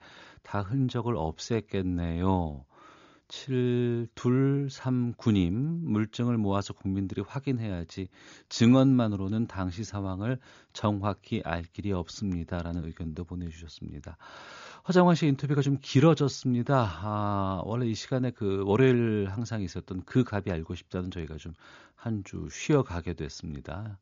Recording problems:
high frequencies cut off; noticeable; nothing above 7 kHz

